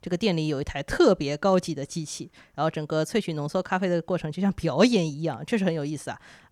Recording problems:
none

